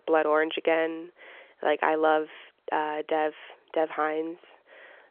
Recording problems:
phone-call audio; nothing above 3.5 kHz

